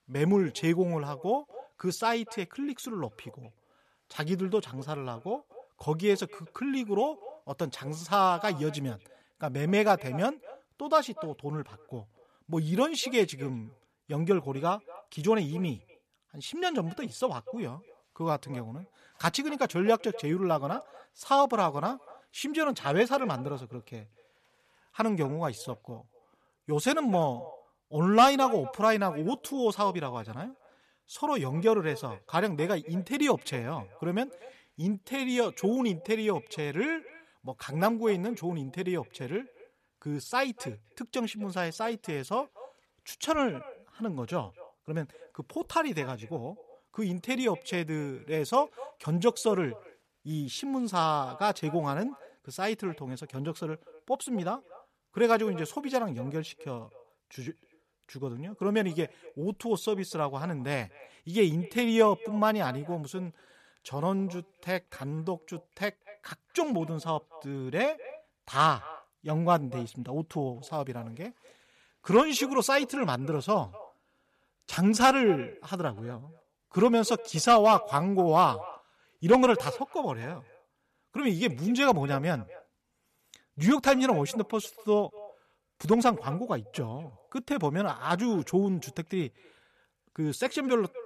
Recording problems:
echo of what is said; faint; throughout; 250 ms later, 20 dB below the speech

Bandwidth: 14 kHz